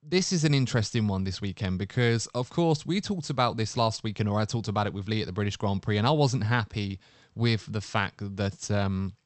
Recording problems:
high frequencies cut off; noticeable; nothing above 8 kHz

